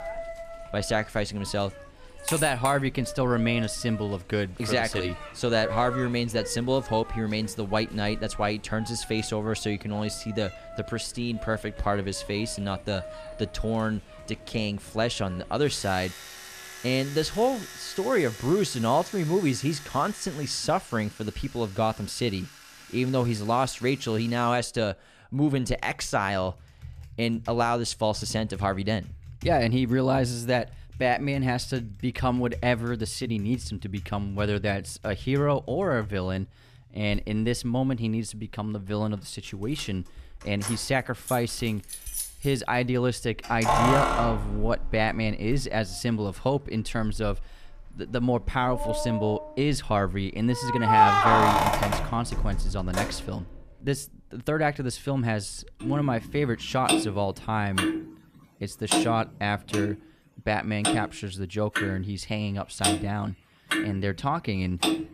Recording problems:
household noises; loud; throughout; 3 dB below the speech

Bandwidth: 14.5 kHz